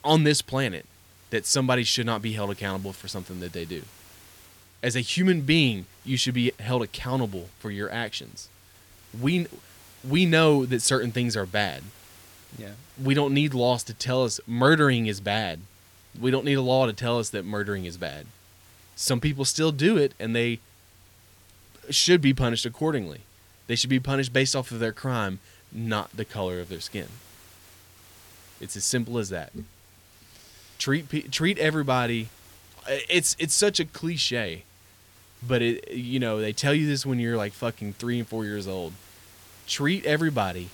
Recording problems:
hiss; faint; throughout; 25 dB below the speech

